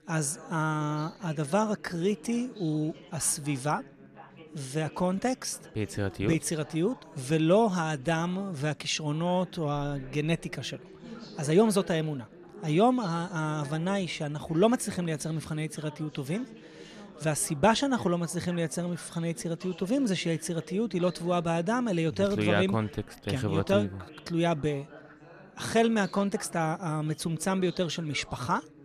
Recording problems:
background chatter; noticeable; throughout; 4 voices, 20 dB below the speech

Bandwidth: 14 kHz